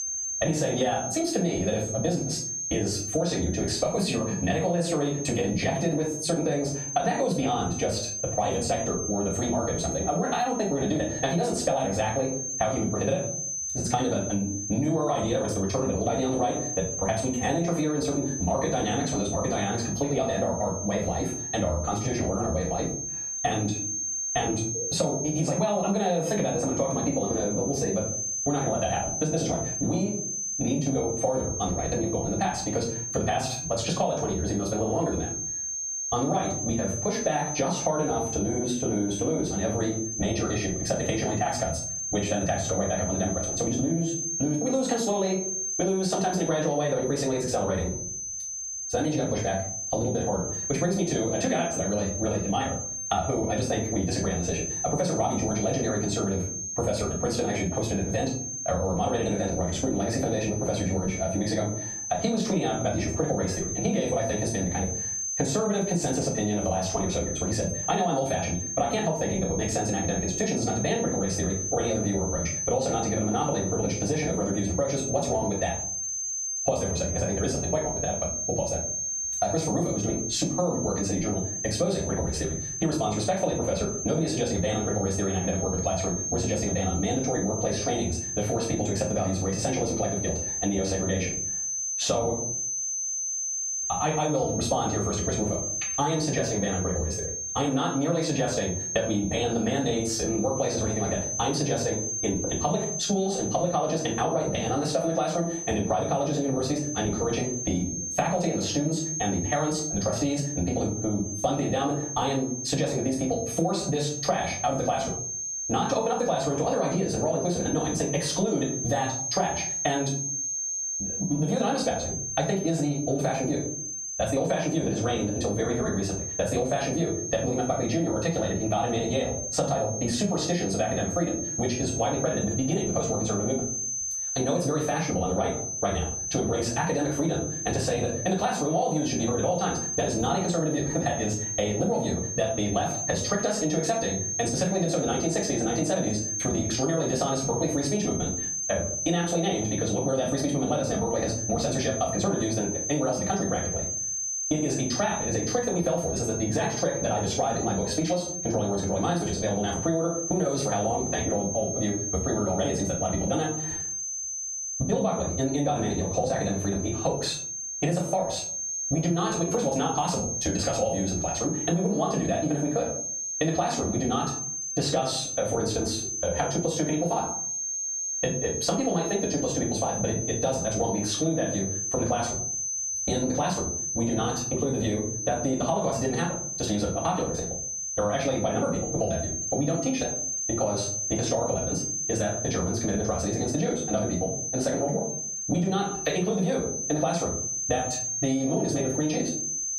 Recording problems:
off-mic speech; far
wrong speed, natural pitch; too fast; 1.5 times normal speed
room echo; slight; dies away in 0.4 s
squashed, flat; somewhat
high-pitched whine; loud; throughout; 6 kHz, 5 dB below the speech

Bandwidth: 15 kHz